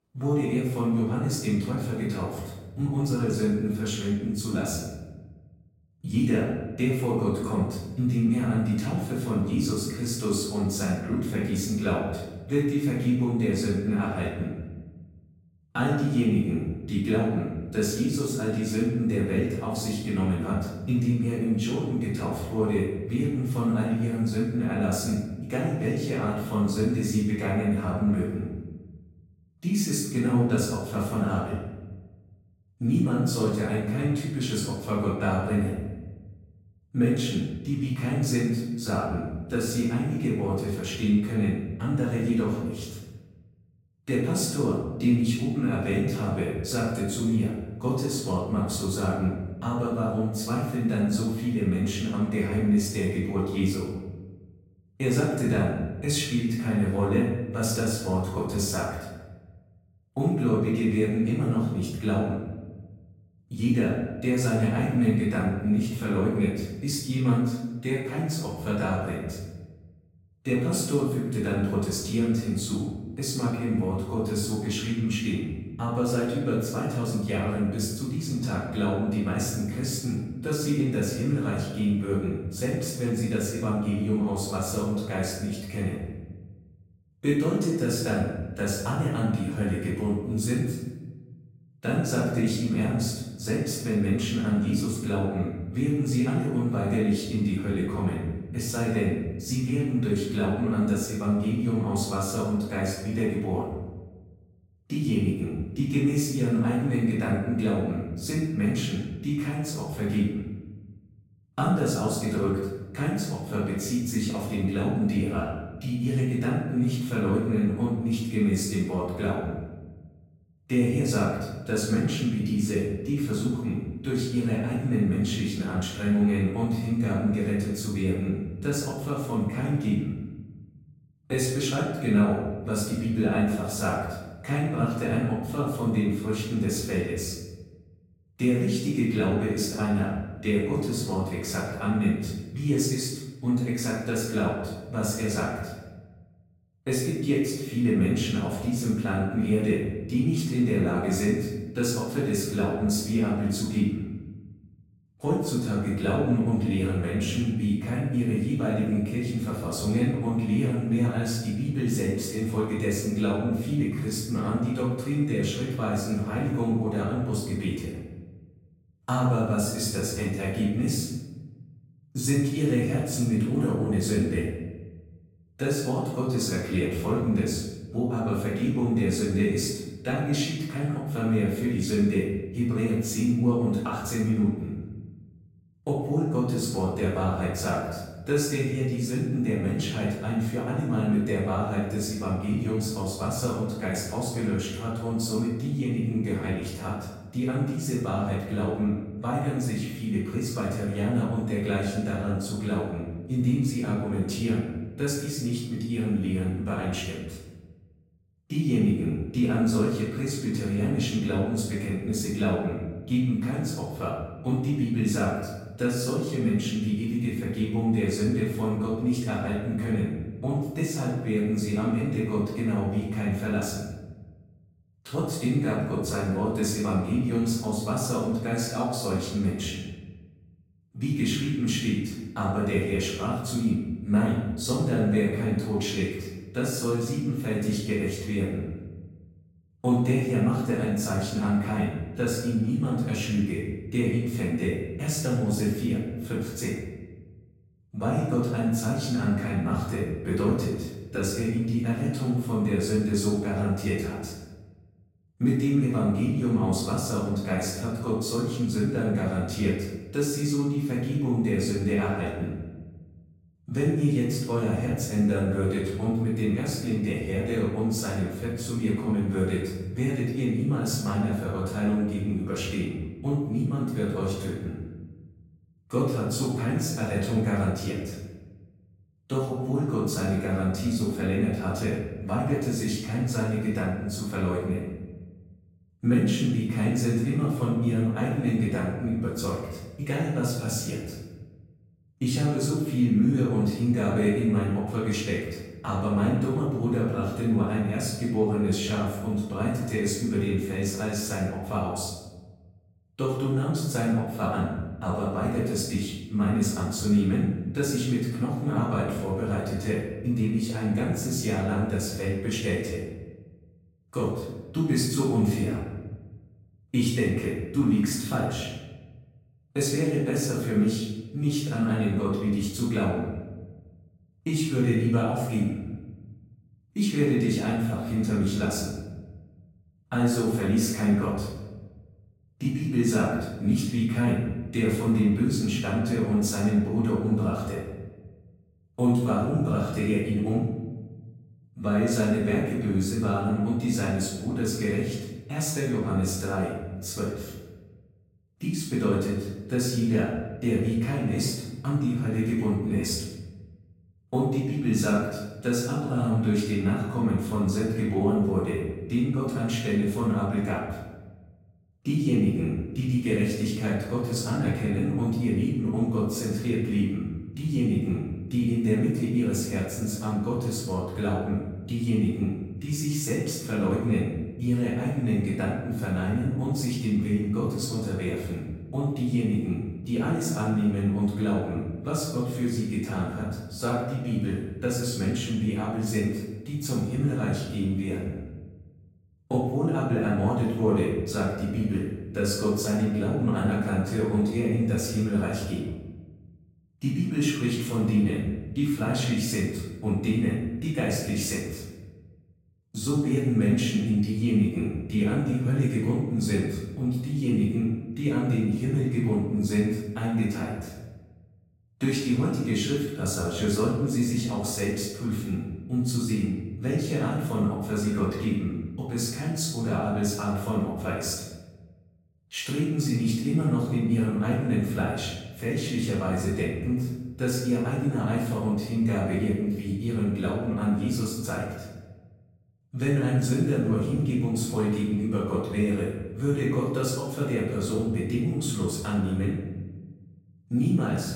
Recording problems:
off-mic speech; far
room echo; noticeable; dies away in 1.1 s

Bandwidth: 16 kHz